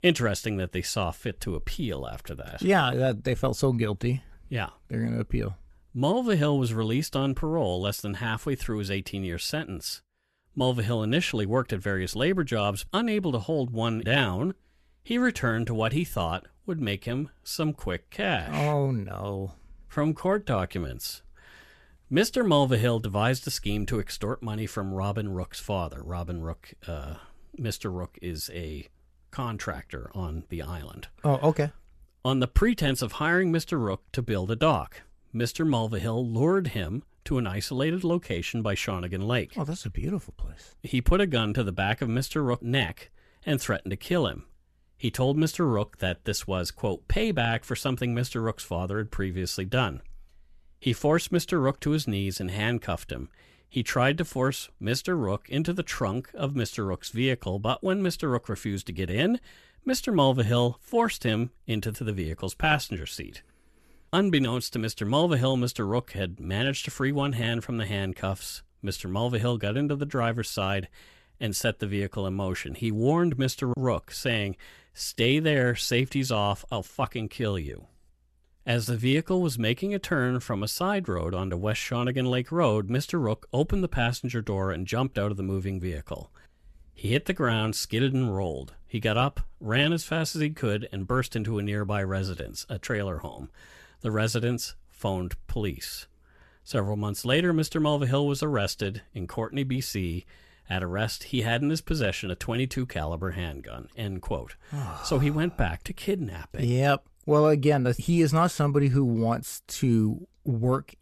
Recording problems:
none

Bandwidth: 13.5 kHz